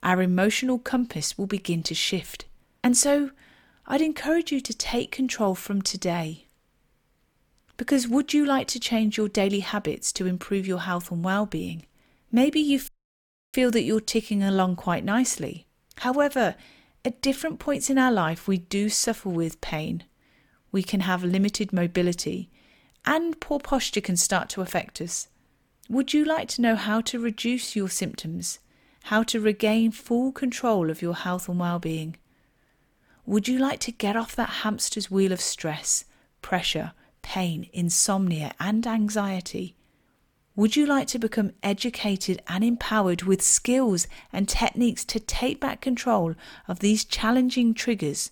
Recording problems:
audio cutting out; at 13 s for 0.5 s

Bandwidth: 18.5 kHz